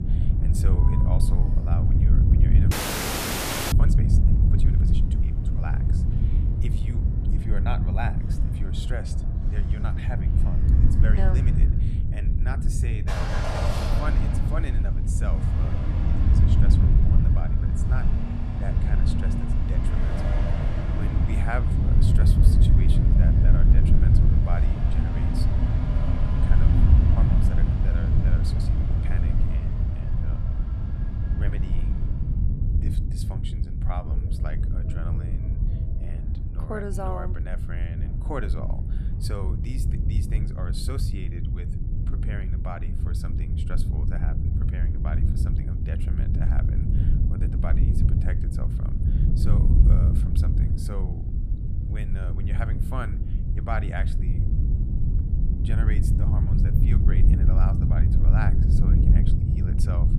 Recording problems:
traffic noise; very loud; throughout; as loud as the speech
wind noise on the microphone; heavy; 1 dB above the speech
audio freezing; at 2.5 s for 1 s

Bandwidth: 14.5 kHz